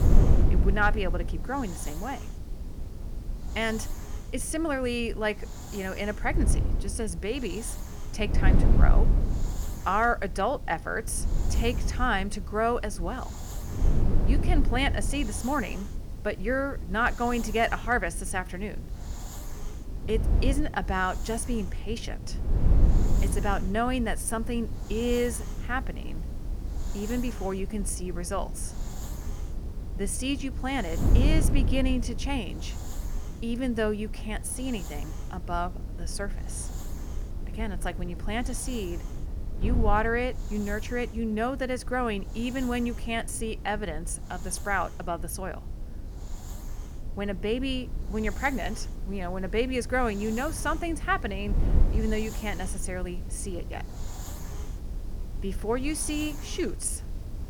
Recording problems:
wind noise on the microphone; occasional gusts; 15 dB below the speech
hiss; noticeable; throughout; 20 dB below the speech

